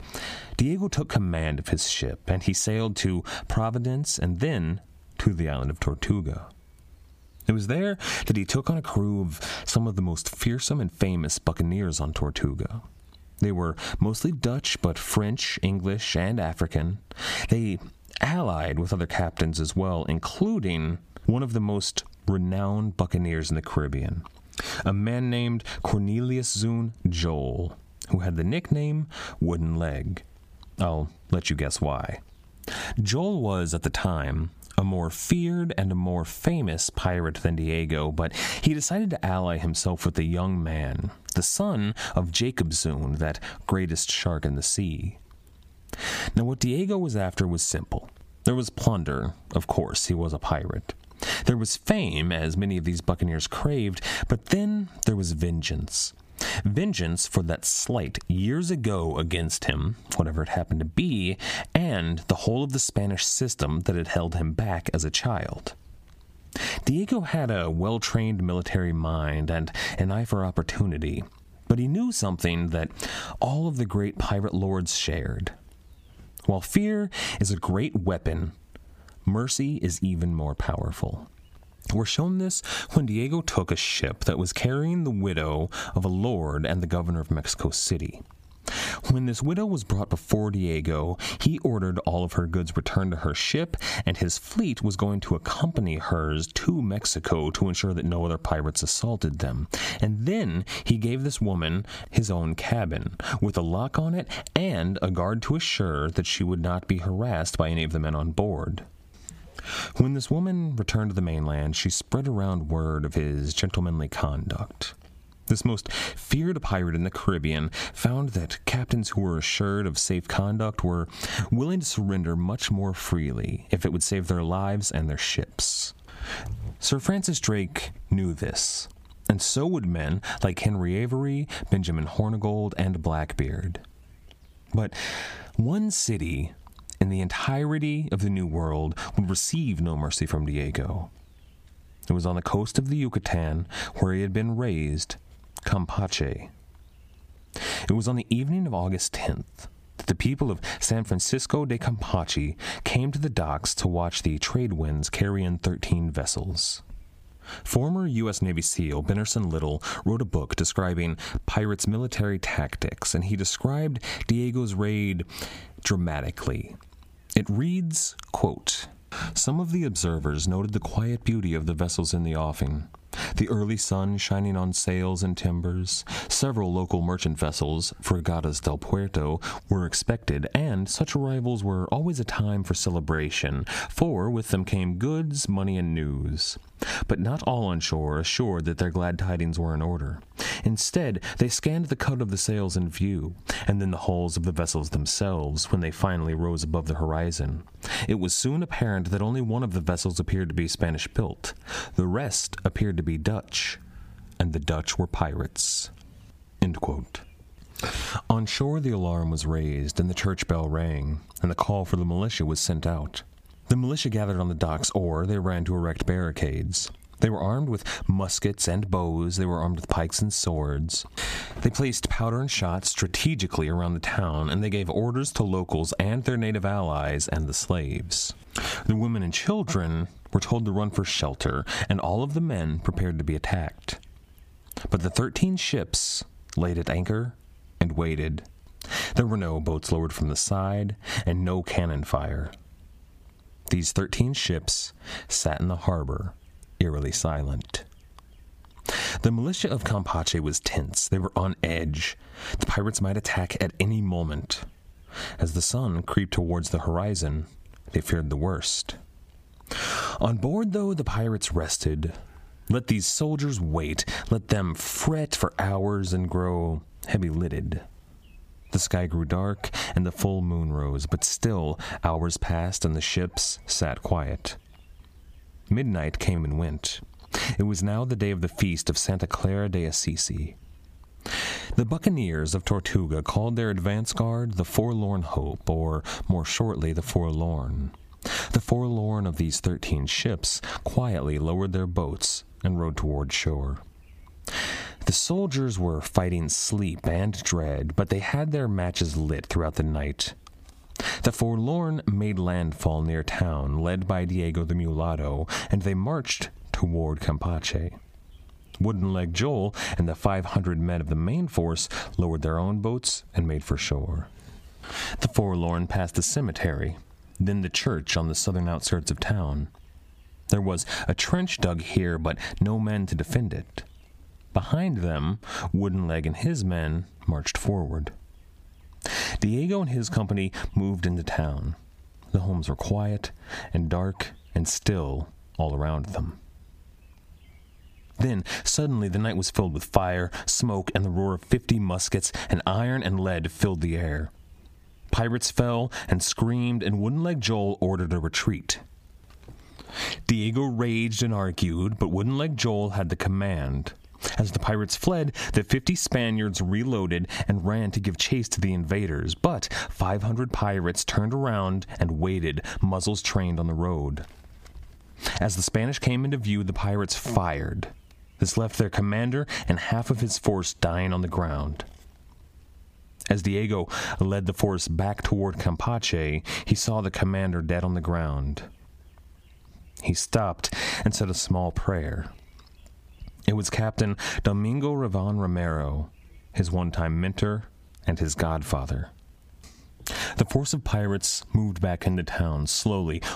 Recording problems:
squashed, flat; heavily

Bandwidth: 15 kHz